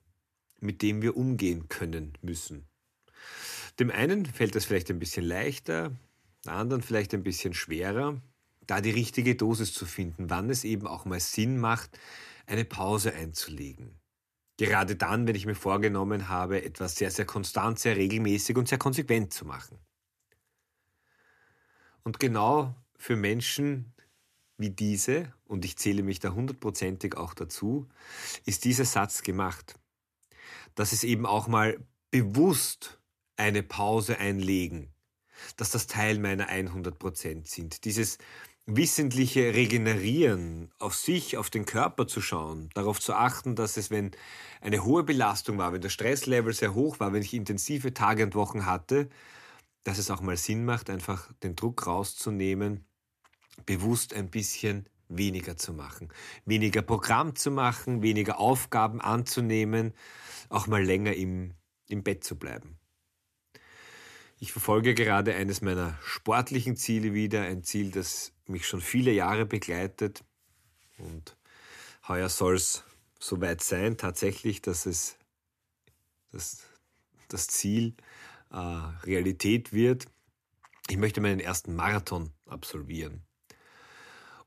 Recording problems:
none

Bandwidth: 14.5 kHz